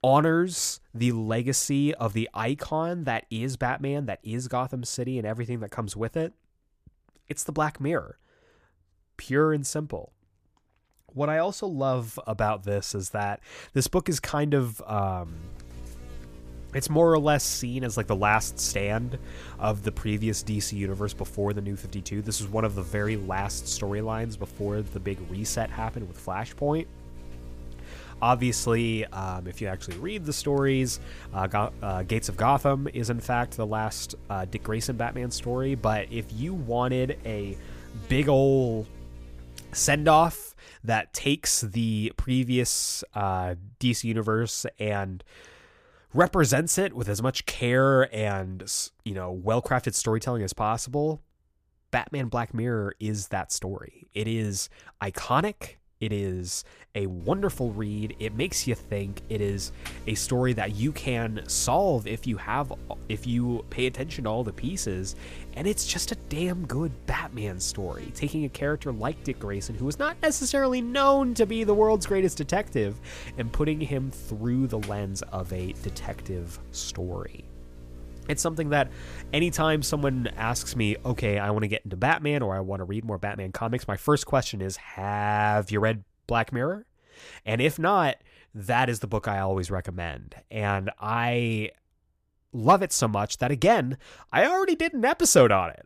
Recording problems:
electrical hum; faint; from 15 to 40 s and from 57 s to 1:21; 60 Hz, 25 dB below the speech

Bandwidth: 15 kHz